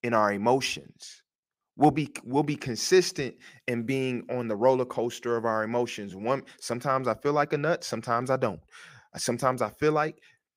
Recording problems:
none

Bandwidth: 15.5 kHz